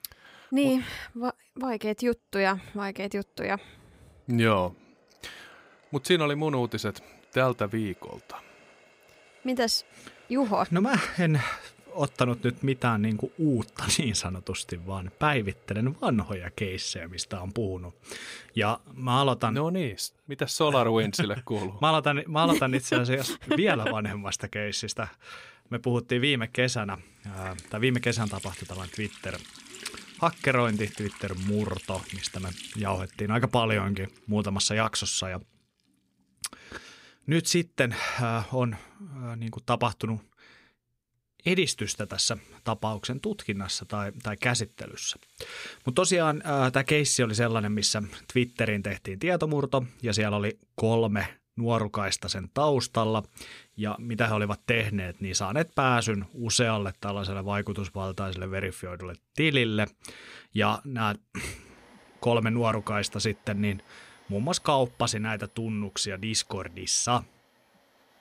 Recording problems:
household noises; faint; throughout; 25 dB below the speech

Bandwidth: 15.5 kHz